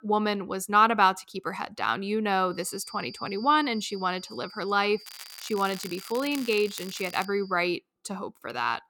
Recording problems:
high-pitched whine; noticeable; from 2.5 to 7.5 s; 4.5 kHz, 20 dB below the speech
crackling; noticeable; from 5 to 7.5 s; 15 dB below the speech

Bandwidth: 18 kHz